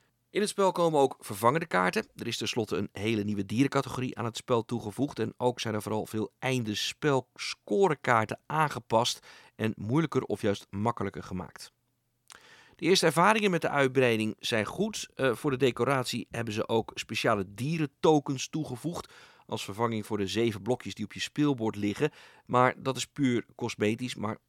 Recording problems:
none

